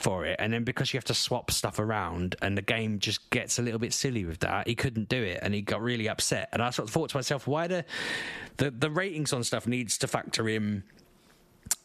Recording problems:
squashed, flat; somewhat

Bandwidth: 14.5 kHz